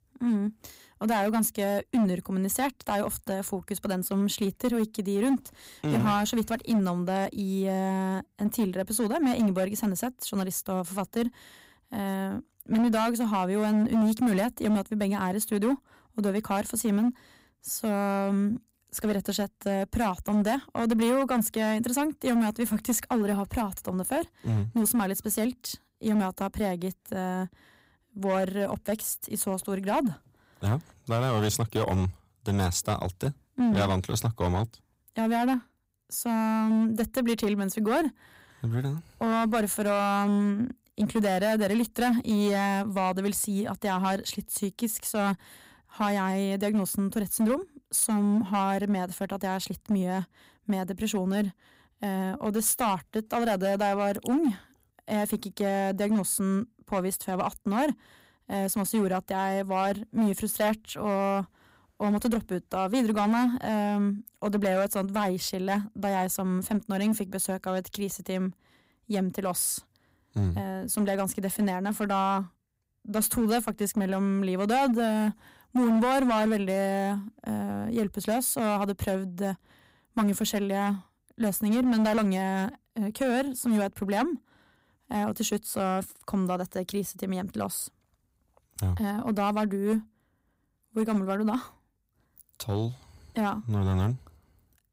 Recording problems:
distortion; slight; 7% of the sound clipped

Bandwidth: 15.5 kHz